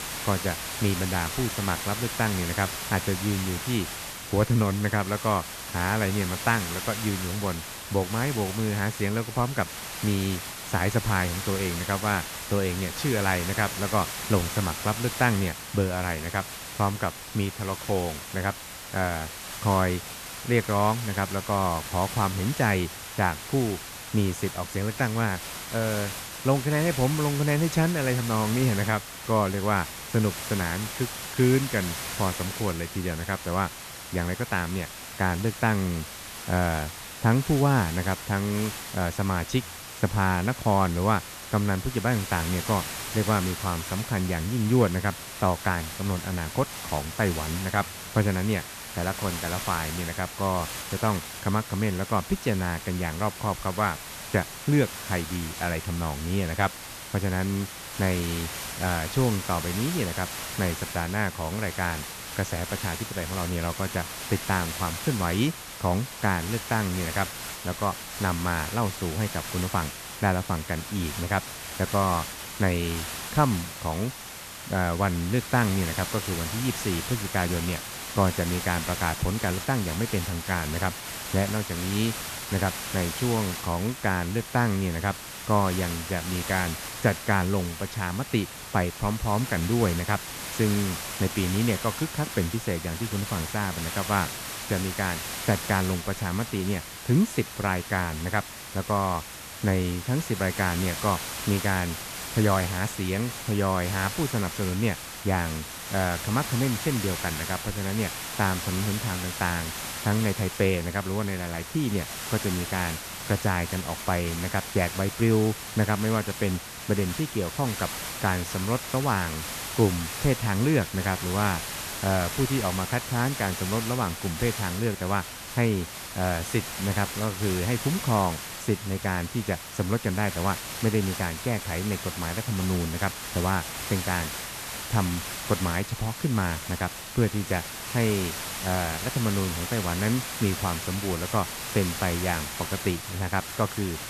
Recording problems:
hiss; loud; throughout; 6 dB below the speech

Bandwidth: 14 kHz